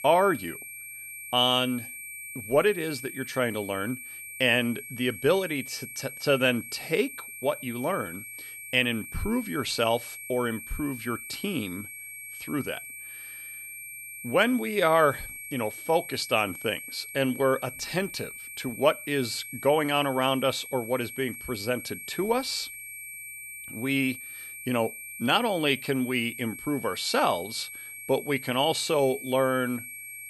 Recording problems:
high-pitched whine; noticeable; throughout; 2.5 kHz, 10 dB below the speech

